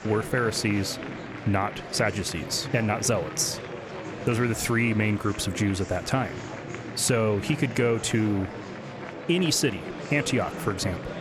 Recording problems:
murmuring crowd; noticeable; throughout; 10 dB below the speech

